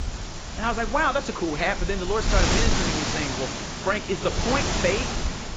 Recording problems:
garbled, watery; badly; nothing above 7.5 kHz
wind noise on the microphone; heavy; 3 dB below the speech
animal sounds; faint; throughout; 25 dB below the speech

